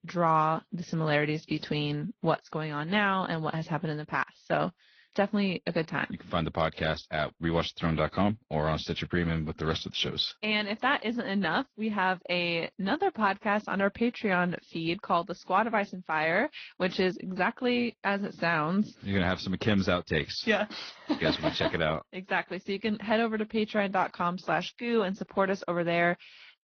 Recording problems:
high frequencies cut off; noticeable; nothing above 6 kHz
garbled, watery; slightly

